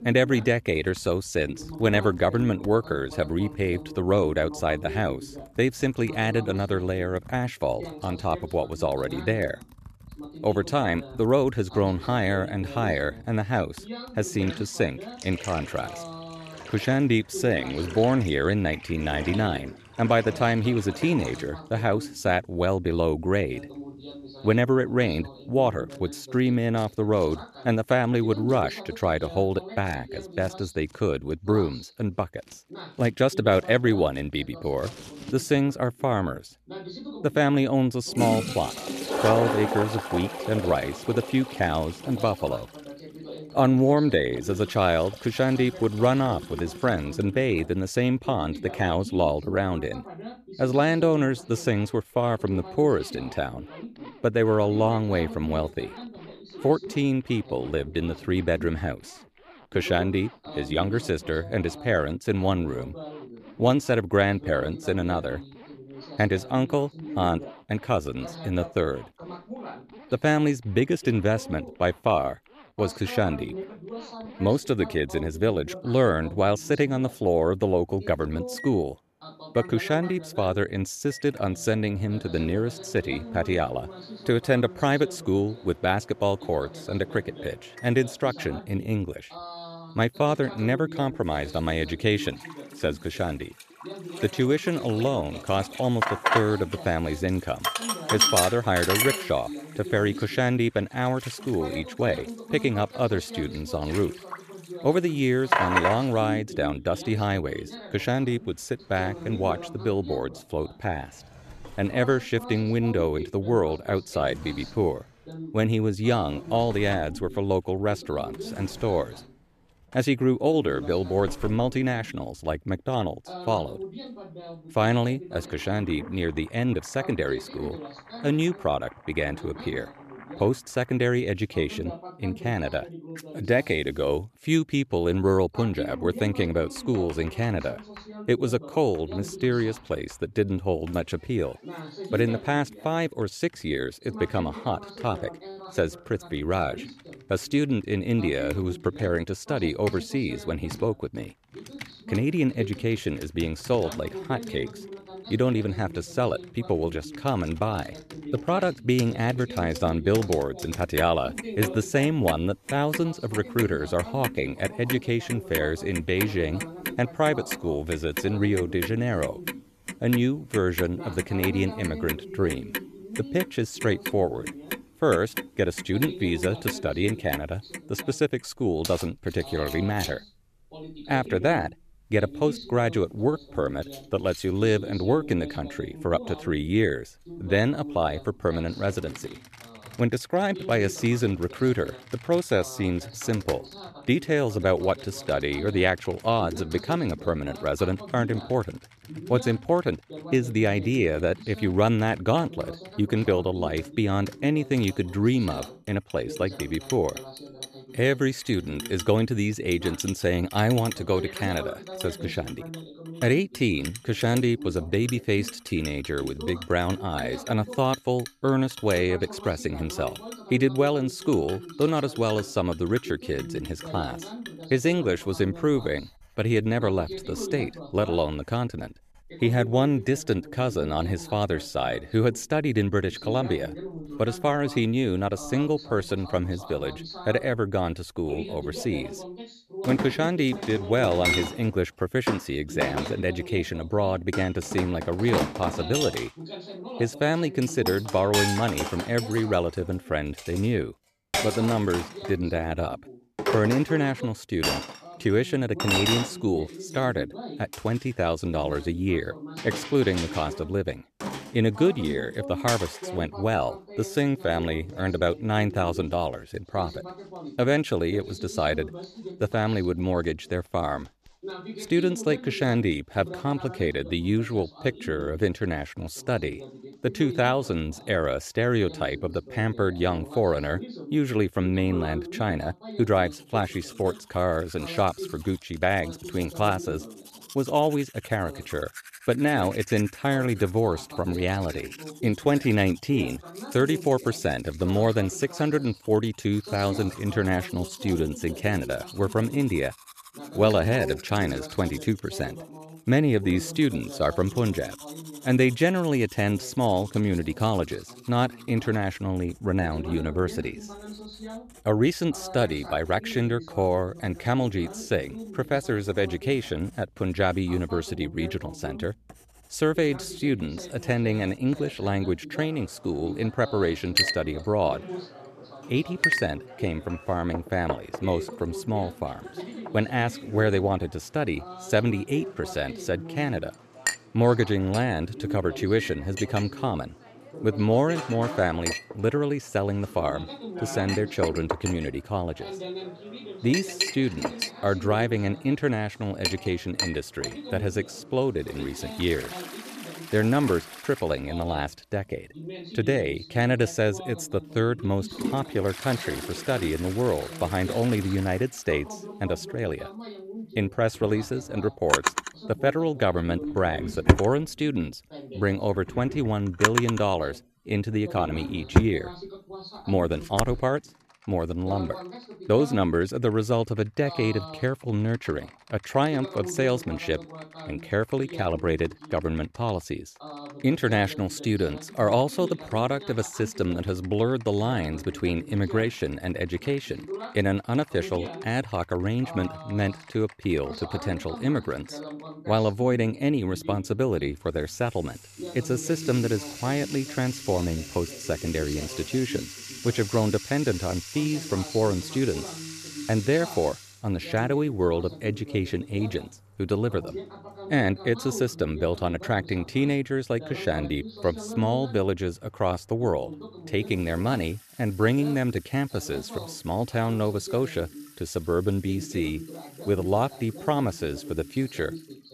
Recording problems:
household noises; loud; throughout; 8 dB below the speech
voice in the background; noticeable; throughout; 15 dB below the speech

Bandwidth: 14.5 kHz